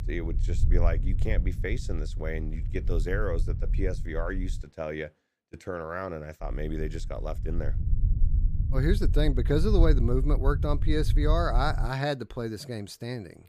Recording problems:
low rumble; noticeable; until 4.5 s and from 6.5 to 12 s; 15 dB below the speech

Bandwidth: 15 kHz